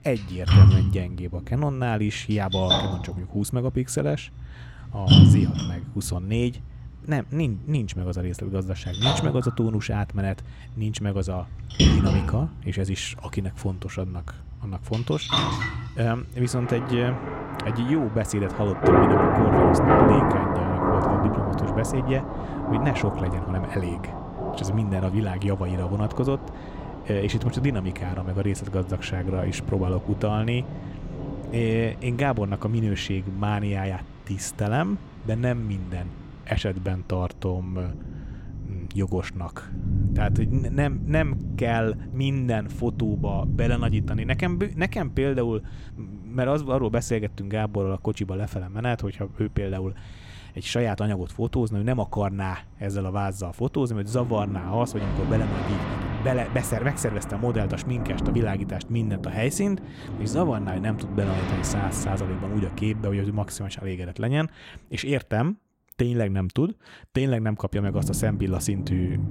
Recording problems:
rain or running water; very loud; throughout; 1 dB above the speech

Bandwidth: 16 kHz